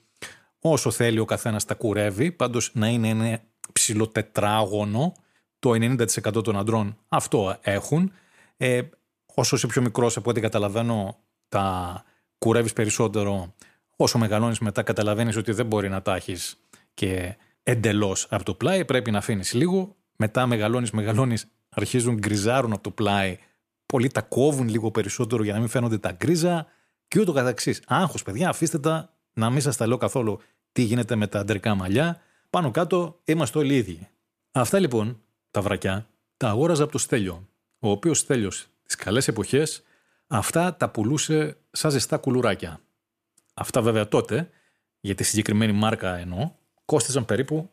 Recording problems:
none

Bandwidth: 14.5 kHz